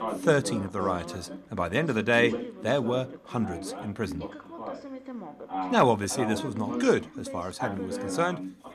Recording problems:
background chatter; loud; throughout; 2 voices, 9 dB below the speech

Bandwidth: 14.5 kHz